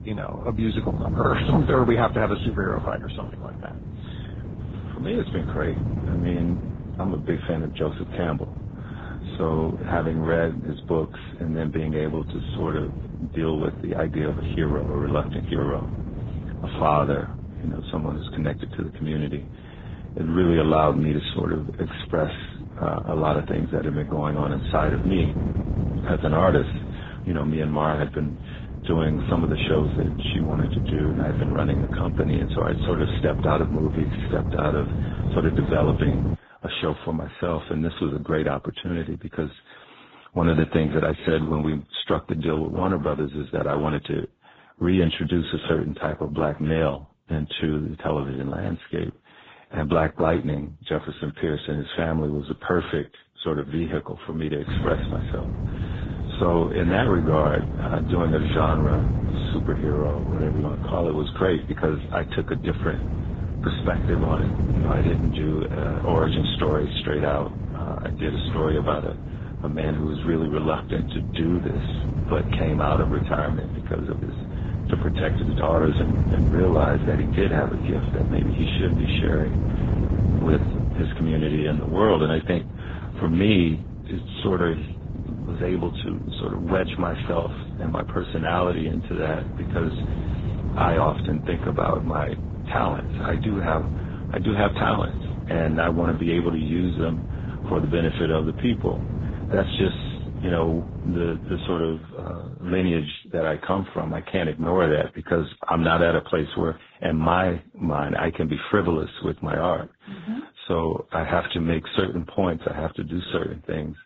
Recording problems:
garbled, watery; badly; nothing above 4 kHz
wind noise on the microphone; occasional gusts; until 36 s and from 55 s to 1:42; 10 dB below the speech

